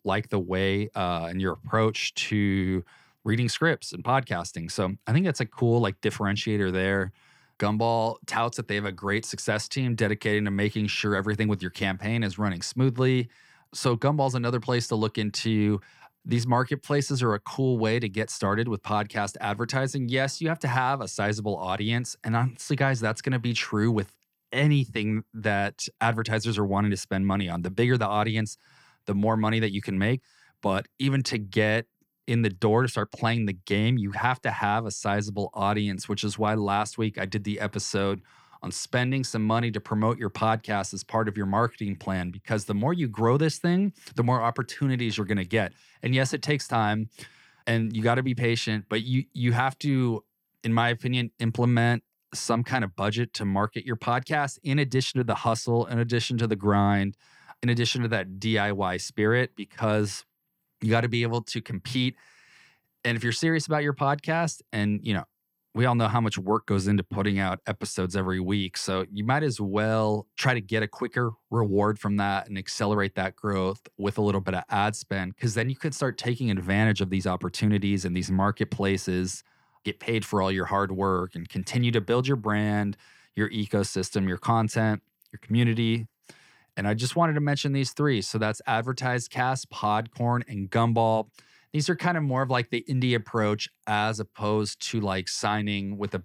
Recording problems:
none

